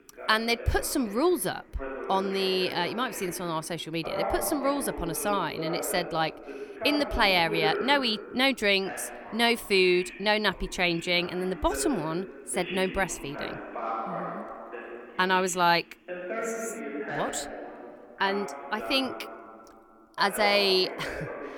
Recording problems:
voice in the background; loud; throughout; 10 dB below the speech

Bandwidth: 18.5 kHz